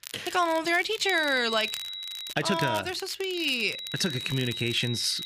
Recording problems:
high-pitched whine; loud; from 1 to 2.5 s and from 3.5 s on; 4 kHz, 7 dB below the speech
crackle, like an old record; noticeable; 15 dB below the speech

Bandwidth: 15 kHz